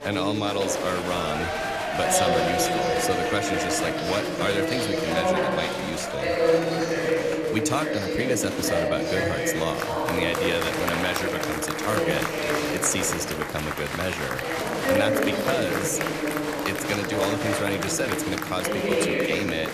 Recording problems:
chatter from many people; very loud; throughout; 3 dB above the speech

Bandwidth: 14.5 kHz